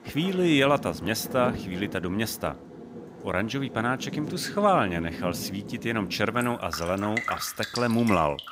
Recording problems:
rain or running water; loud; throughout; 10 dB below the speech

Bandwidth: 15.5 kHz